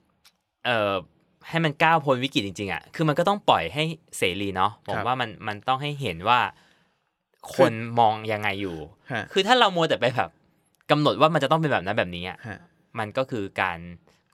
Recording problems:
none

